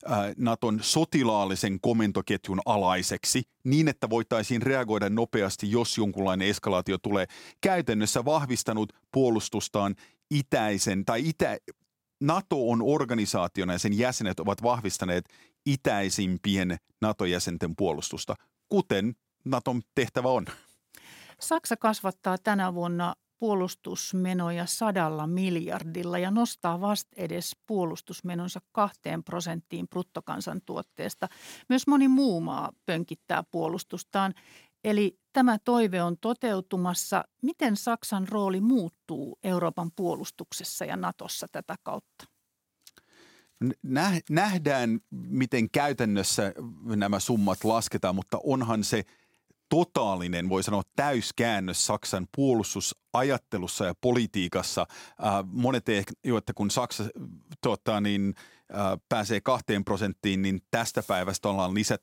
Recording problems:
none

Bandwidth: 16.5 kHz